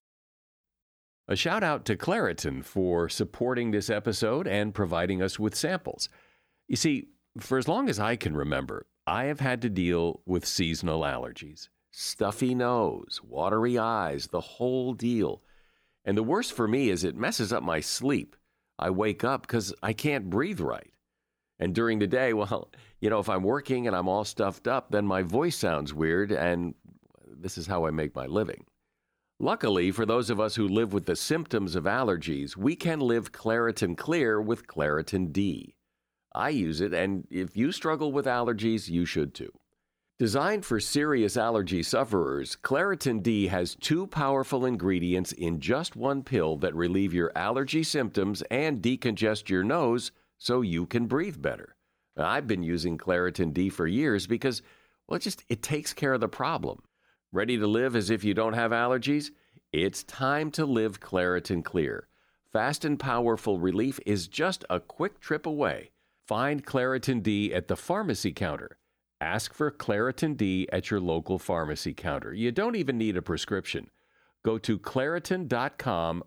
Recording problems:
none

